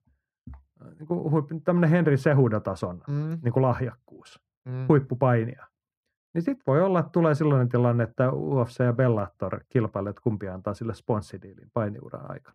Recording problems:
muffled; very; fading above 3 kHz

